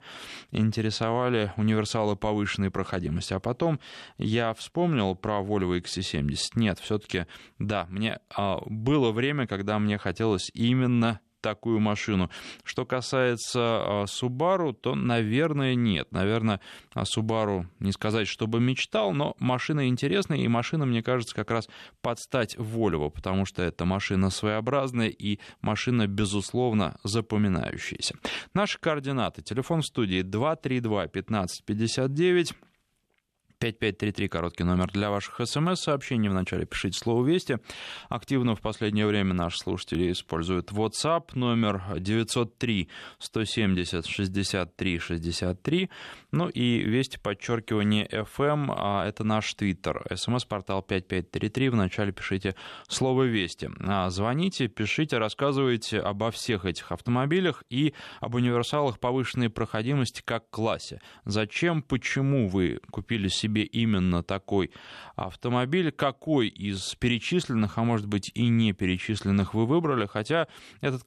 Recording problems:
none

